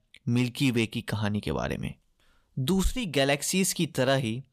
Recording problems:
none

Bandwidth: 14.5 kHz